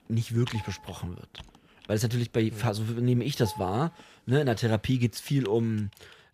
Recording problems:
household noises; noticeable; throughout; 20 dB below the speech

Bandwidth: 14.5 kHz